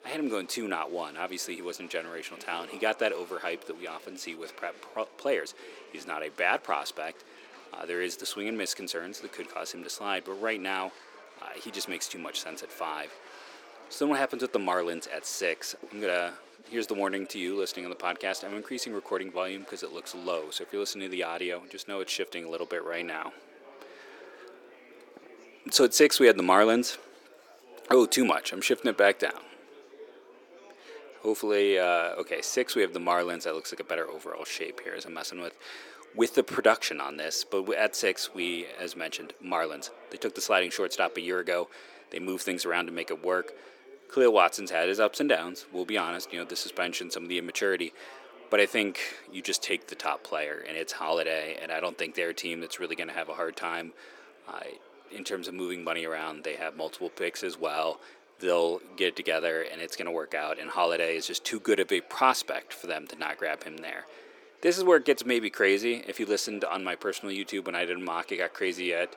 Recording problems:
thin; somewhat; fading below 350 Hz
murmuring crowd; faint; throughout; 20 dB below the speech

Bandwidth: 17.5 kHz